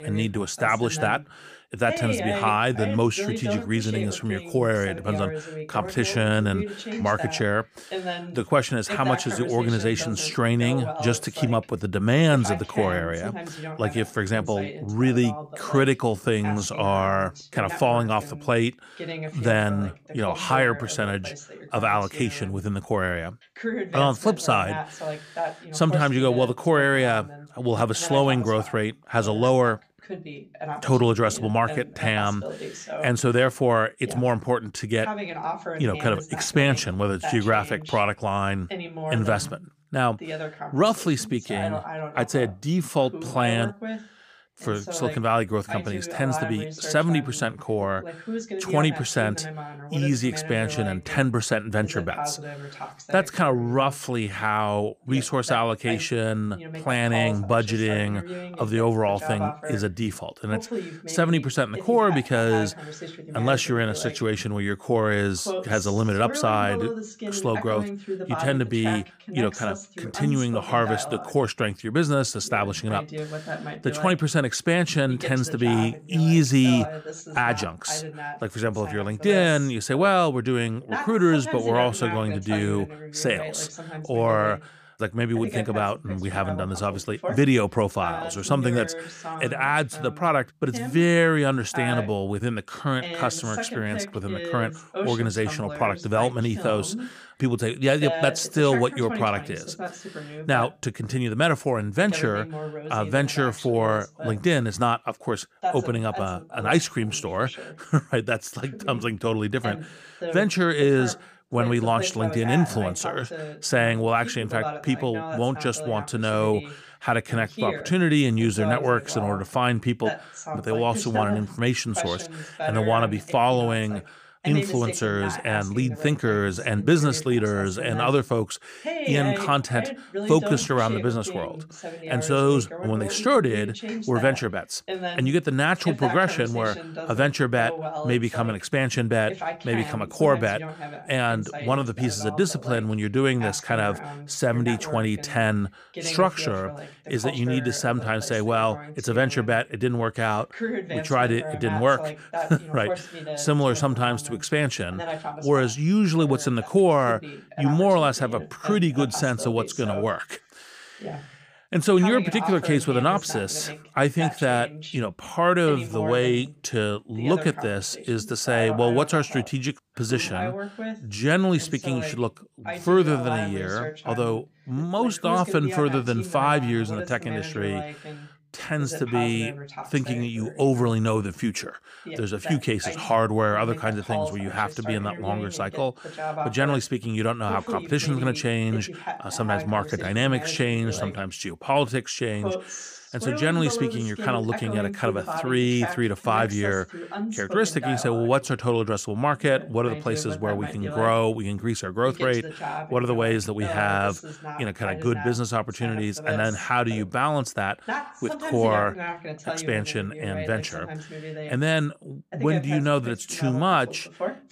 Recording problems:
voice in the background; loud; throughout; 10 dB below the speech

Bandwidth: 15 kHz